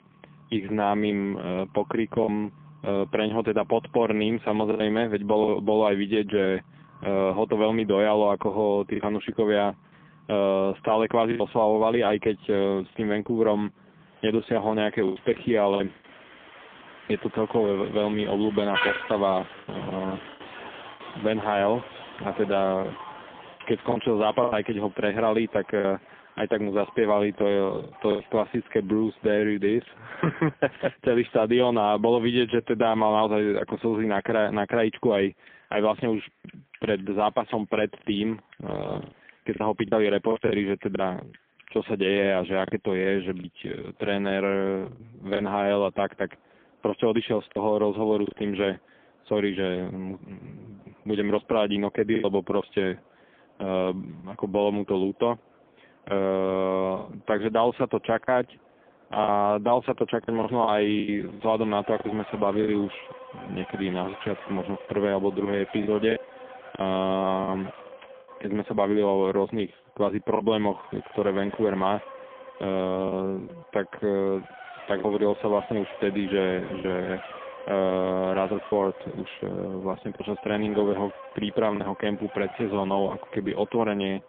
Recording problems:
phone-call audio; poor line; nothing above 3.5 kHz
traffic noise; noticeable; throughout; 15 dB below the speech
choppy; occasionally; 4% of the speech affected

